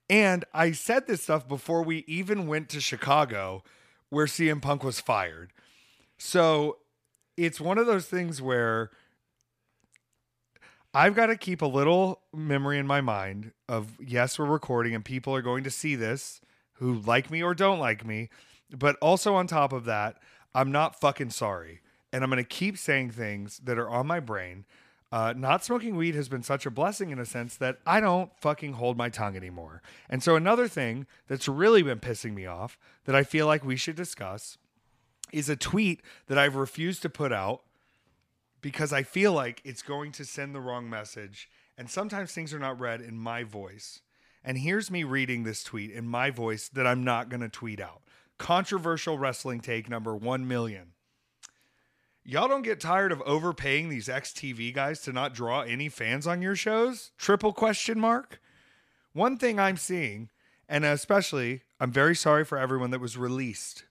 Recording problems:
none

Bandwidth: 14.5 kHz